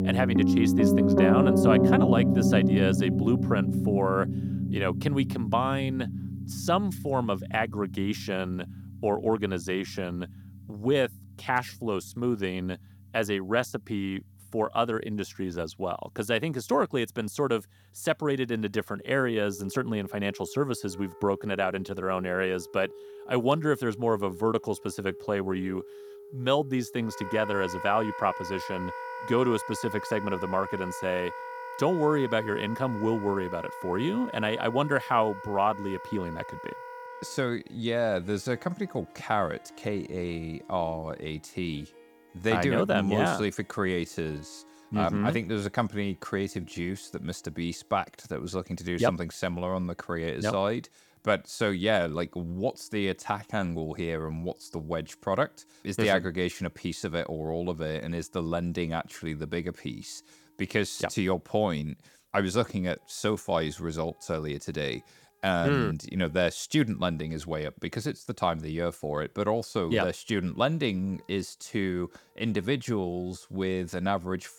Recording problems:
background music; very loud; throughout; as loud as the speech

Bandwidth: 18 kHz